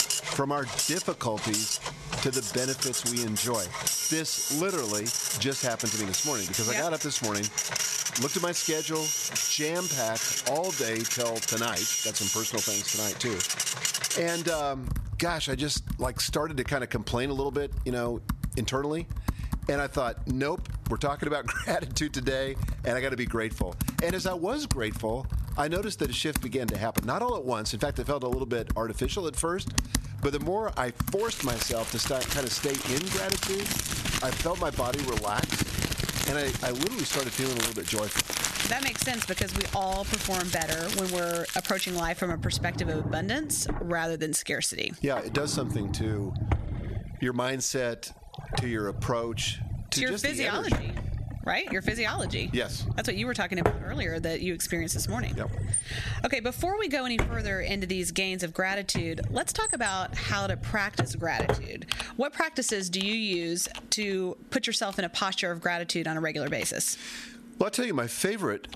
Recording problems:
squashed, flat; somewhat
household noises; loud; throughout; 1 dB below the speech

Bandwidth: 13.5 kHz